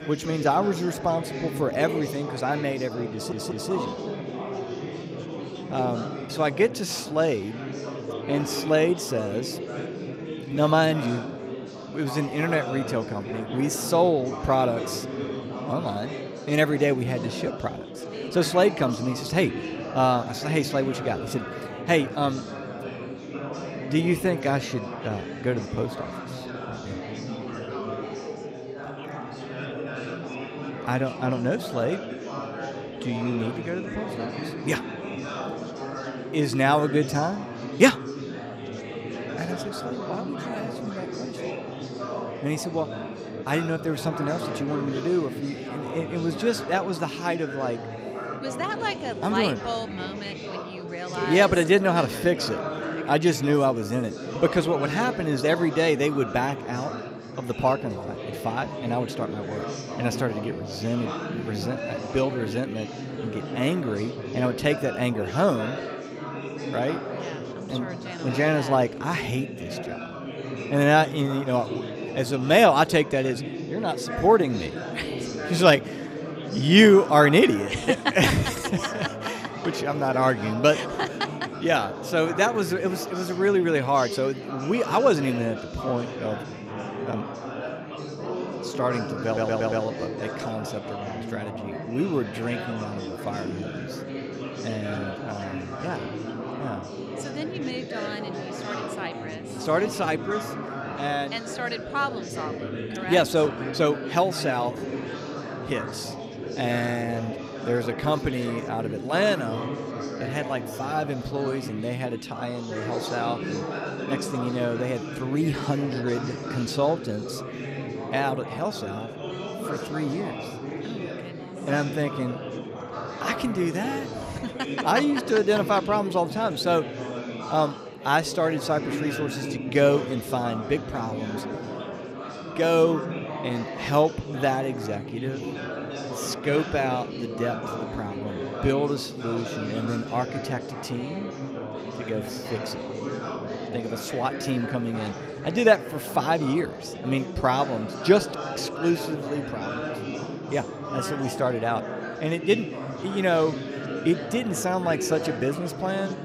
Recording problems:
chatter from many people; loud; throughout; 8 dB below the speech
audio stuttering; at 3 s and at 1:29

